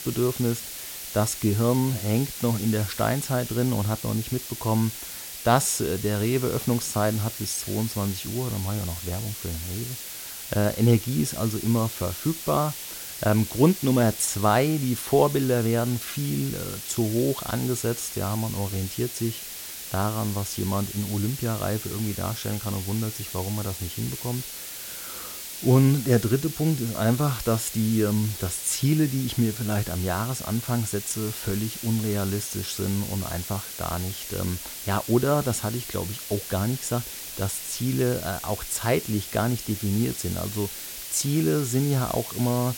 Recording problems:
hiss; loud; throughout; 8 dB below the speech

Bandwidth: 16.5 kHz